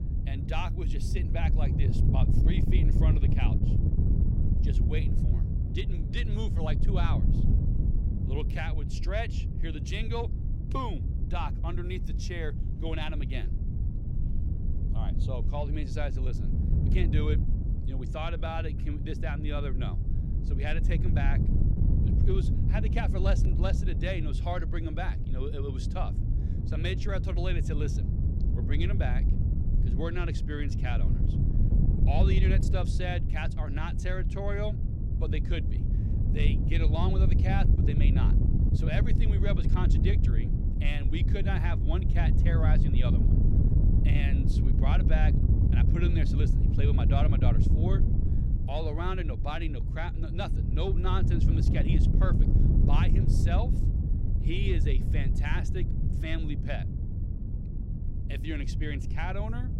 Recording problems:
wind noise on the microphone; heavy; 4 dB below the speech

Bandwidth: 16.5 kHz